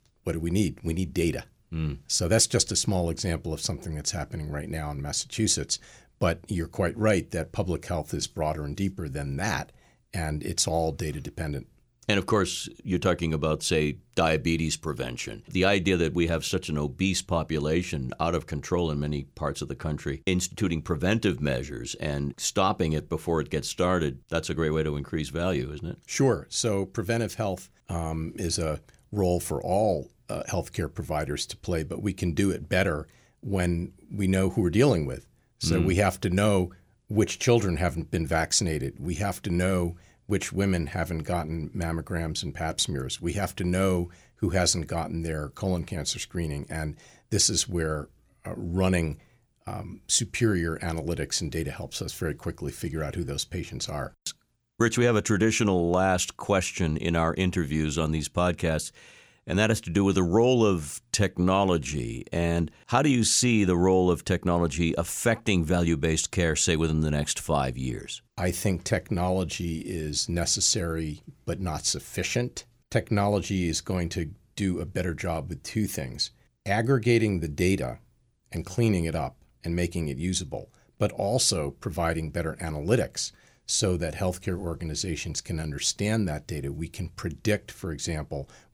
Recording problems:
none

